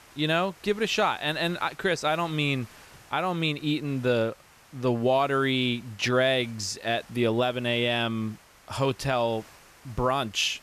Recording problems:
hiss; faint; throughout; 25 dB below the speech

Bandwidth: 14.5 kHz